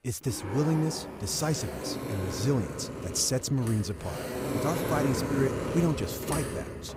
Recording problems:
household noises; loud; throughout; 4 dB below the speech

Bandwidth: 15.5 kHz